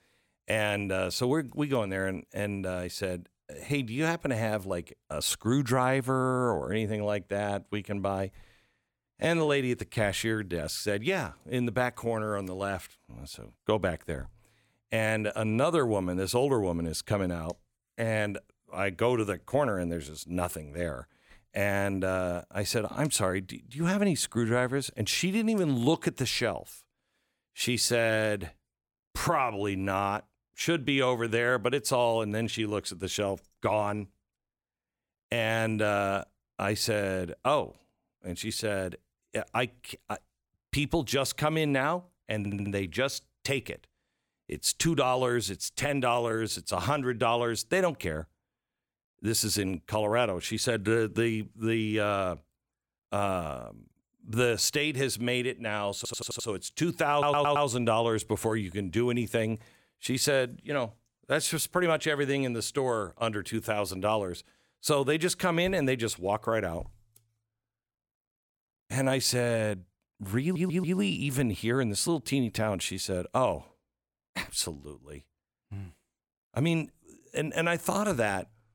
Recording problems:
audio stuttering; 4 times, first at 42 s

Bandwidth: 17.5 kHz